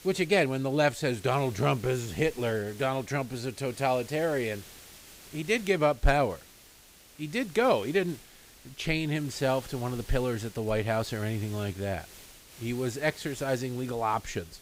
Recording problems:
hiss; noticeable; throughout; 20 dB below the speech

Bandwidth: 15.5 kHz